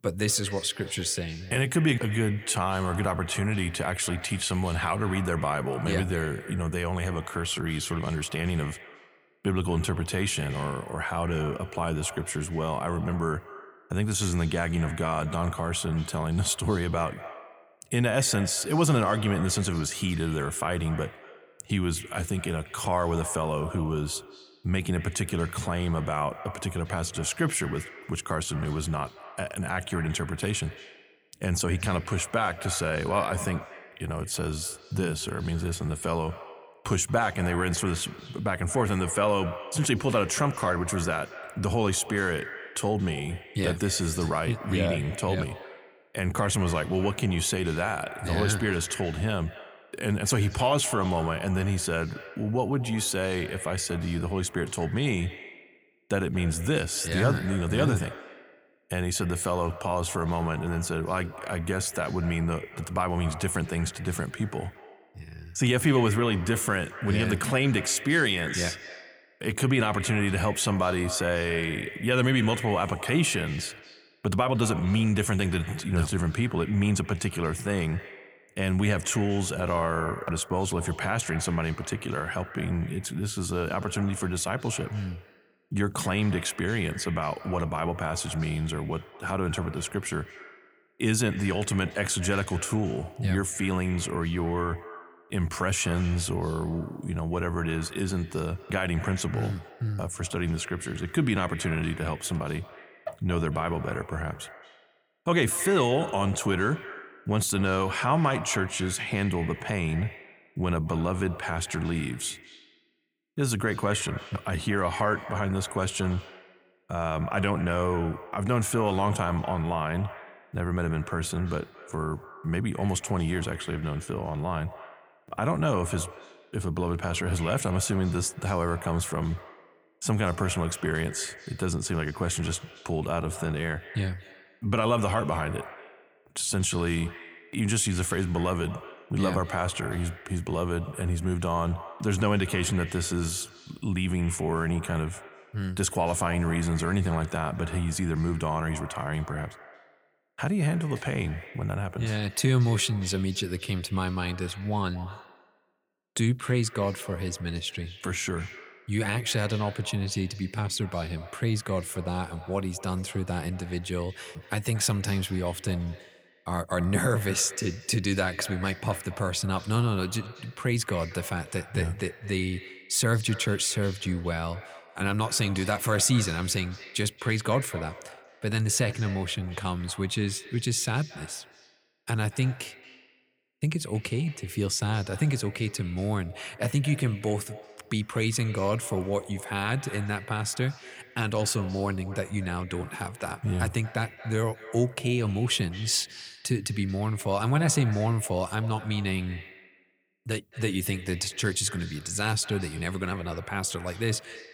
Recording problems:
echo of what is said; noticeable; throughout; 230 ms later, 15 dB below the speech

